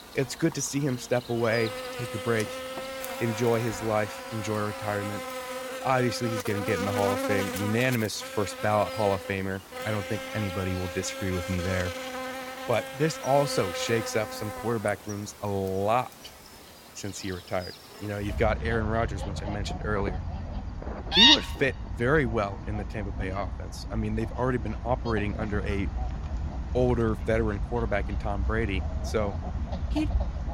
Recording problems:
animal sounds; loud; throughout; 2 dB below the speech

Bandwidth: 16.5 kHz